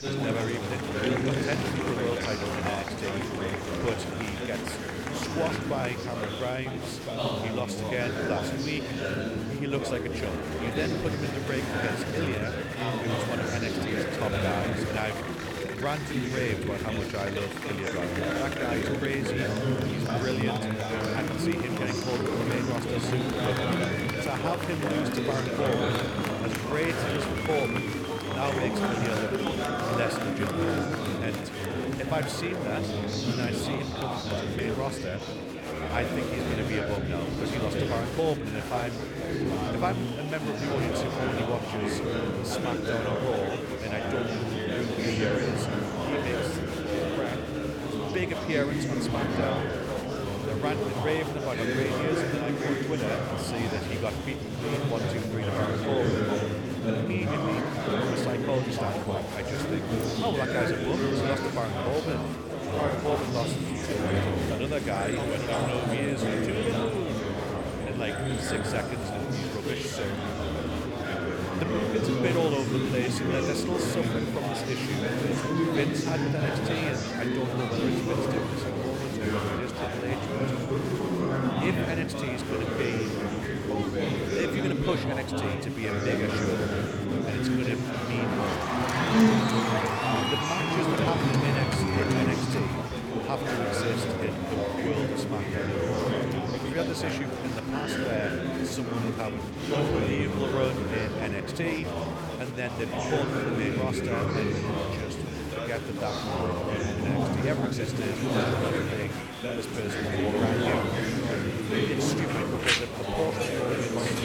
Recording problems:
chatter from many people; very loud; throughout; 5 dB above the speech

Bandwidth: 18 kHz